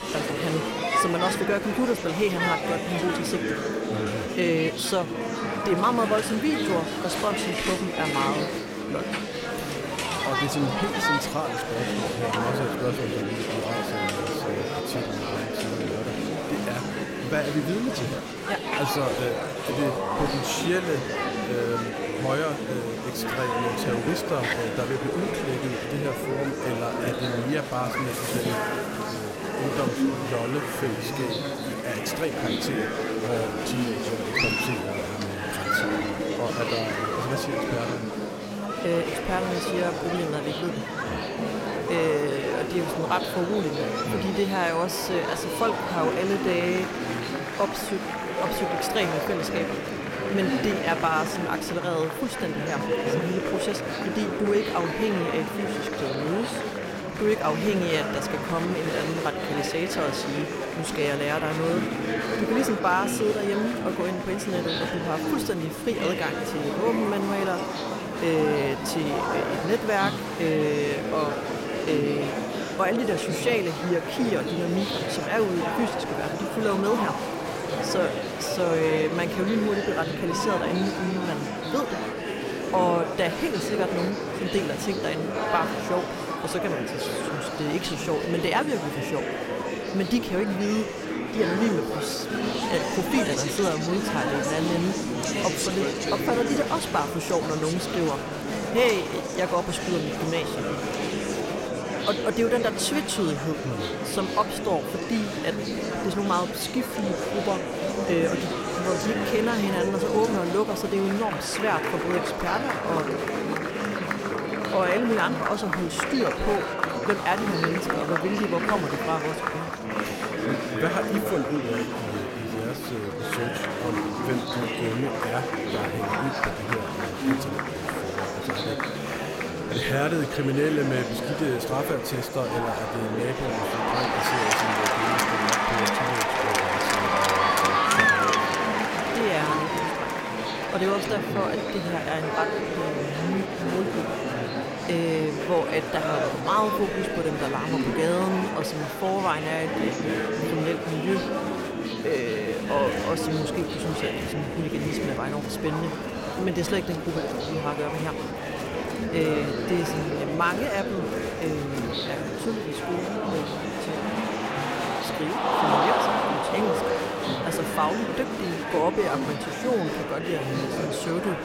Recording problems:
murmuring crowd; very loud; throughout; 1 dB above the speech

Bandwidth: 16 kHz